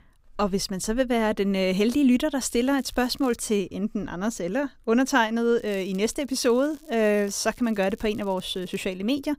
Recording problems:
crackling; faint; at 2.5 s and from 5.5 to 9 s; 30 dB below the speech

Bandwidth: 15.5 kHz